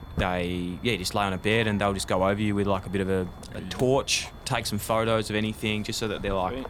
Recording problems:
high-pitched whine; faint; throughout; 3.5 kHz, 30 dB below the speech
footsteps; noticeable; peak 8 dB below the speech

